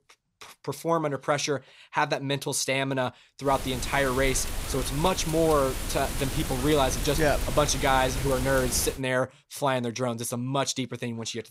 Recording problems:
wind noise on the microphone; heavy; from 3.5 to 9 s; 9 dB below the speech

